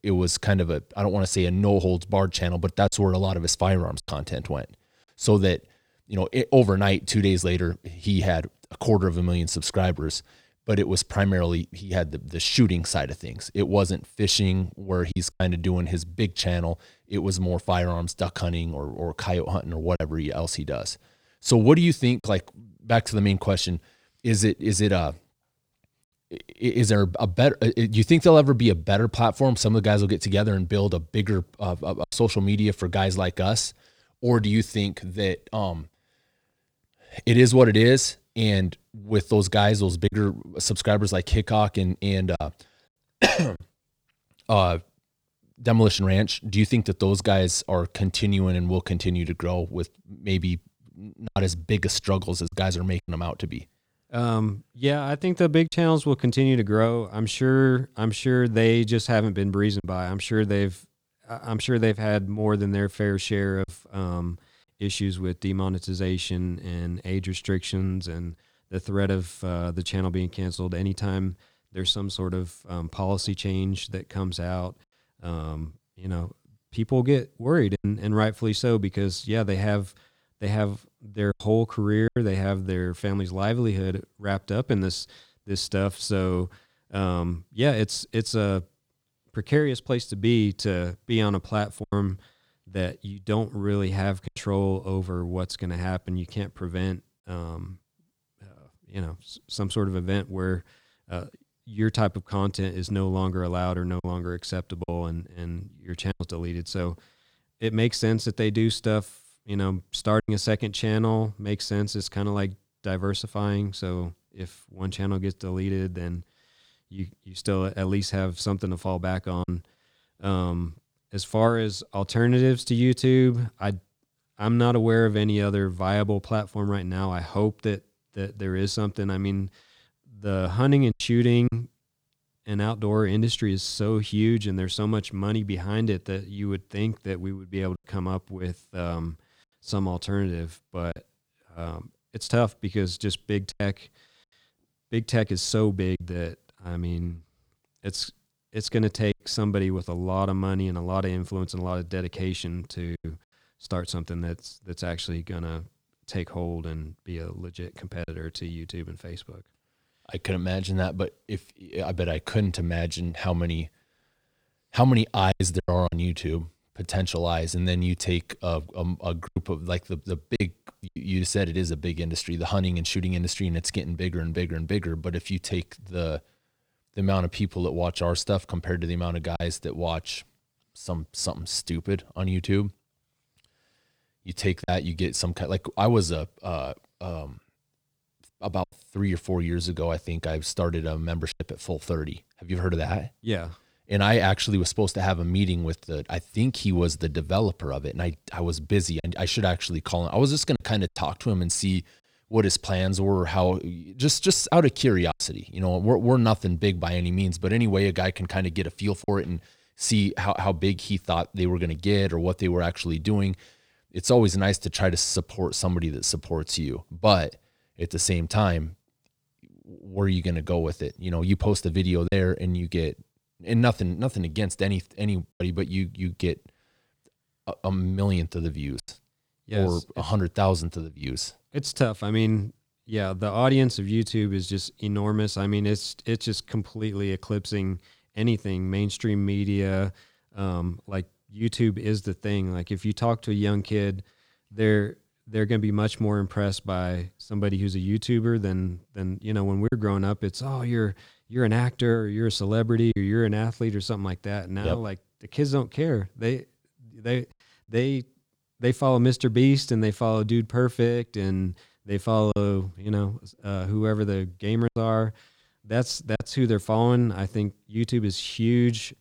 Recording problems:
choppy; occasionally; 2% of the speech affected

